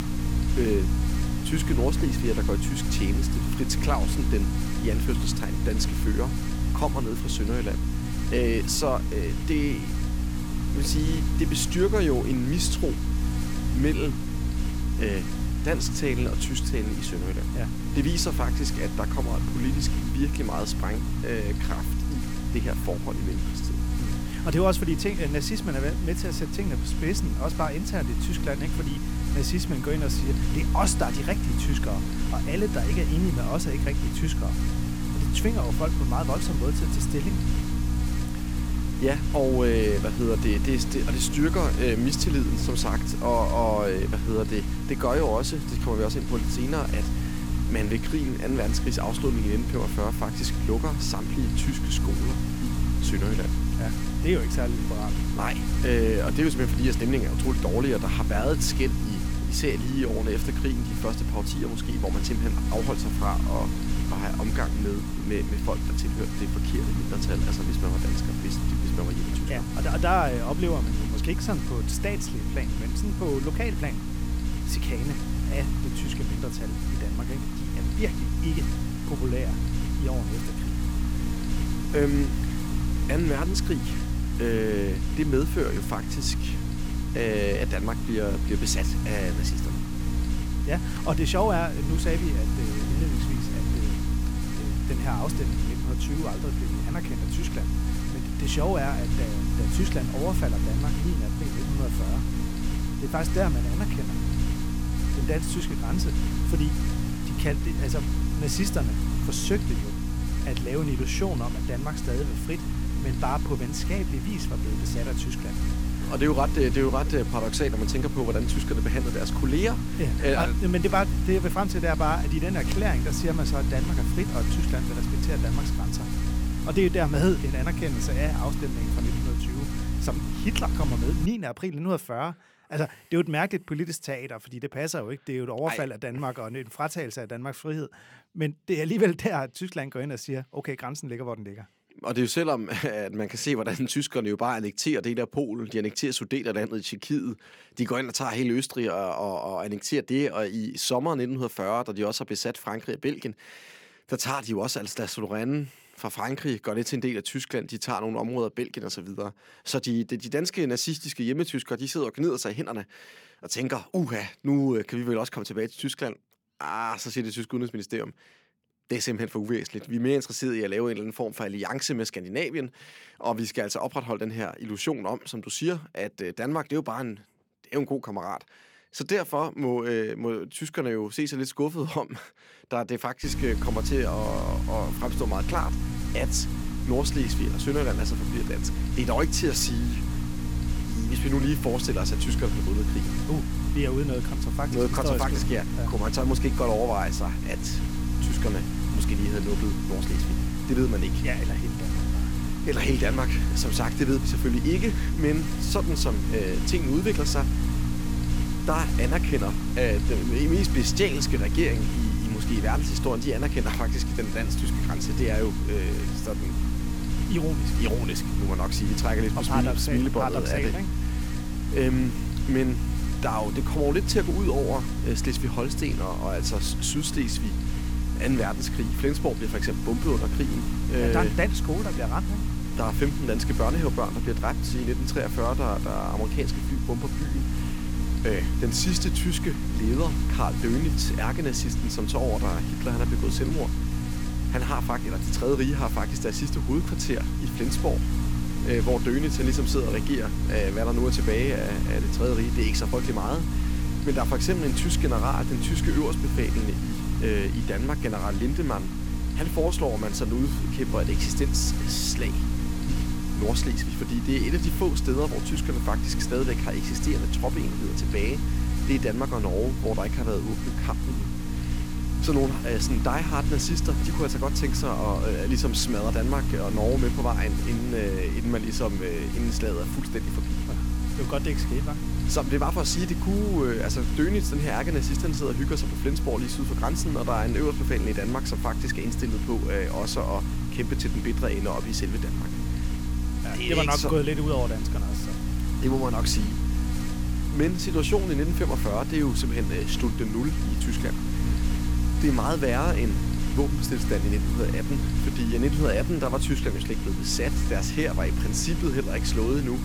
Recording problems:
electrical hum; loud; until 2:11 and from 3:03 on; 60 Hz, 6 dB below the speech

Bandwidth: 17 kHz